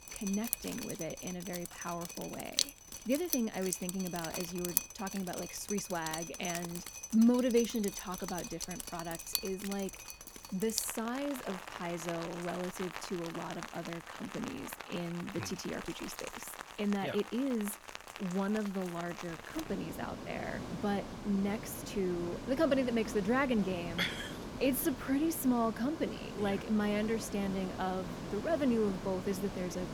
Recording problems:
rain or running water; loud; throughout; 6 dB below the speech

